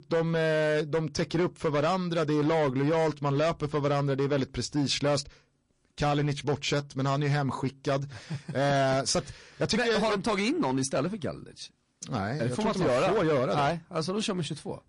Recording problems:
distortion; slight; 12% of the sound clipped
garbled, watery; slightly; nothing above 10.5 kHz

